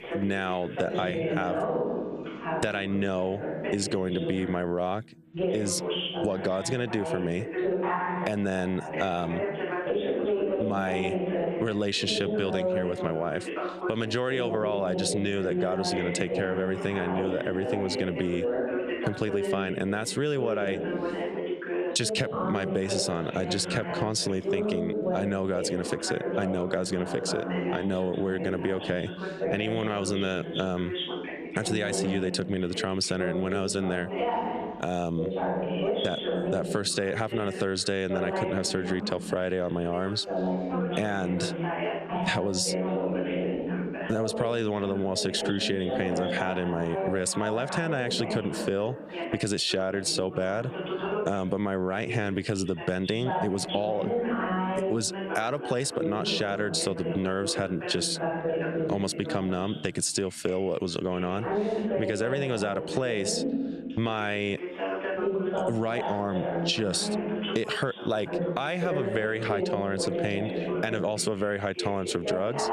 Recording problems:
squashed, flat; somewhat, background pumping
background chatter; loud; throughout; 2 voices, 3 dB below the speech

